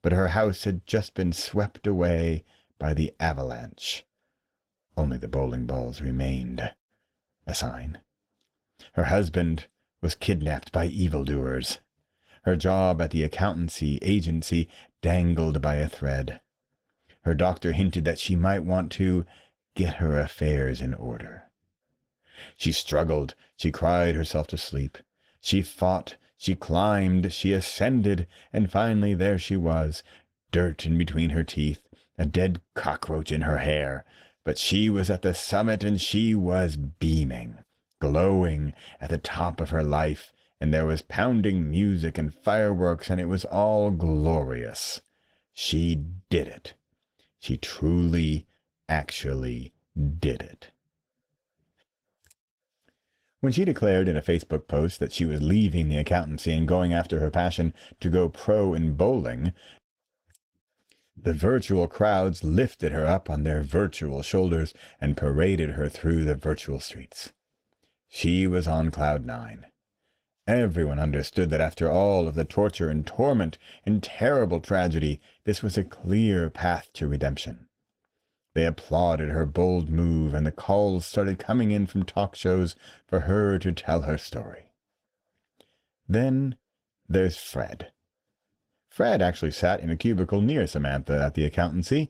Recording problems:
garbled, watery; slightly; nothing above 16 kHz

